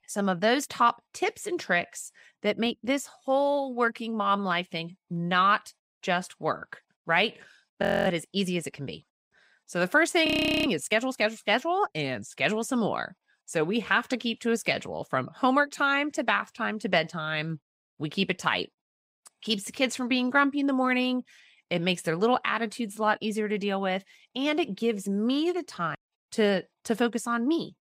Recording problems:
audio freezing; at 8 s and at 10 s

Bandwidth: 15.5 kHz